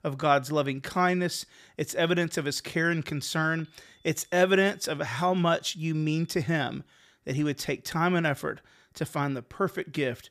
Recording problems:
high-pitched whine; faint; from 3 to 6.5 s; 3.5 kHz, 35 dB below the speech

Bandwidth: 15 kHz